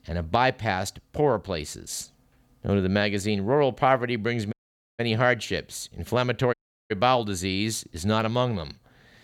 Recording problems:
audio cutting out; at 4.5 s and at 6.5 s

